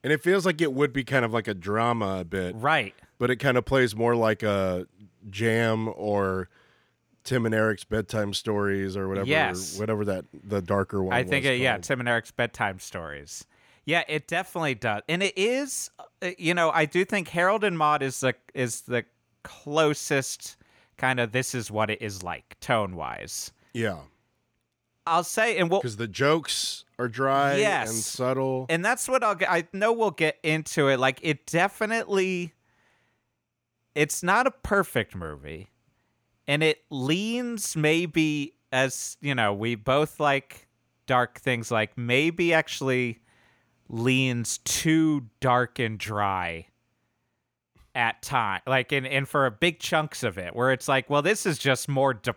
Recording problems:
none

